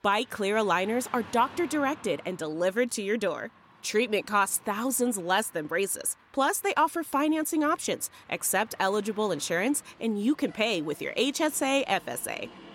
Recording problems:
traffic noise; faint; throughout; 25 dB below the speech

